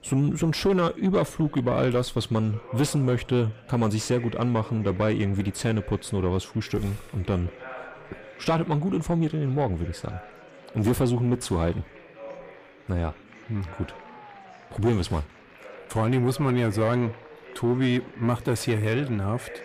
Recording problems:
distortion; slight; 10 dB below the speech
chatter from many people; noticeable; throughout; 20 dB below the speech

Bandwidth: 15 kHz